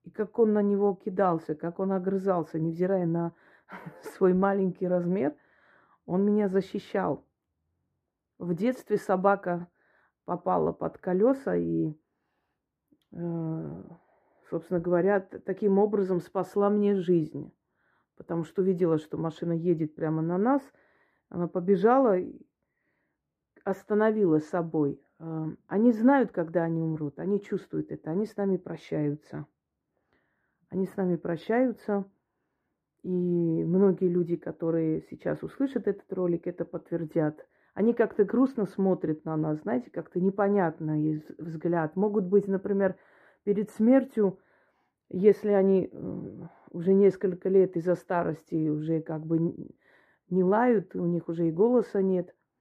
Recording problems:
muffled; very; fading above 2.5 kHz

